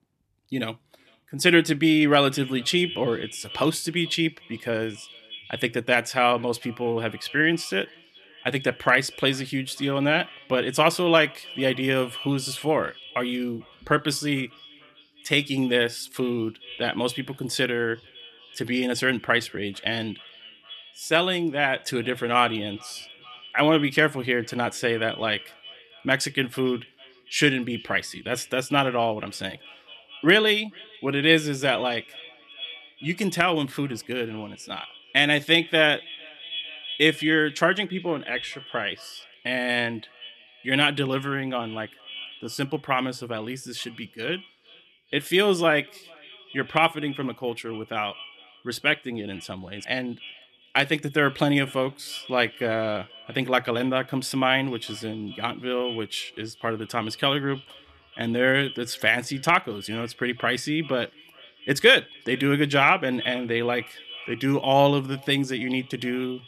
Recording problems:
echo of what is said; noticeable; throughout; 440 ms later, 20 dB below the speech

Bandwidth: 13.5 kHz